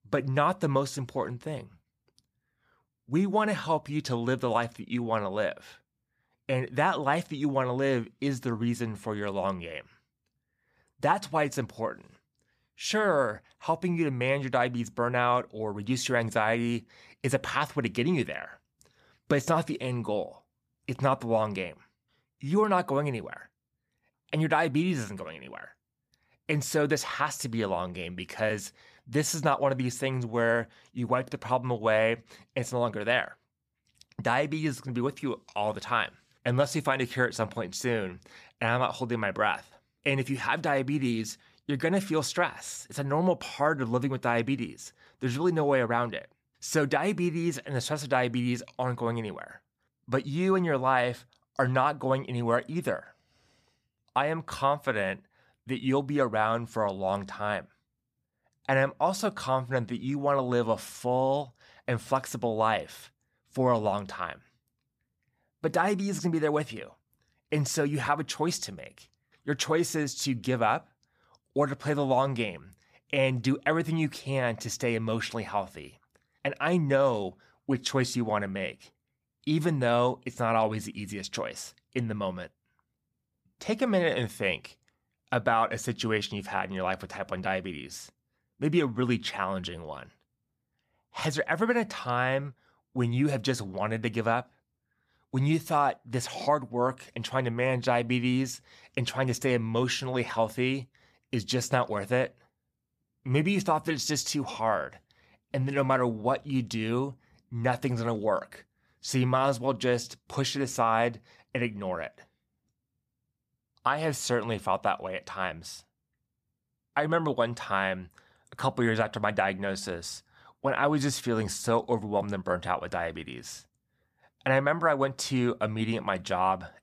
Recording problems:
none

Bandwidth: 15 kHz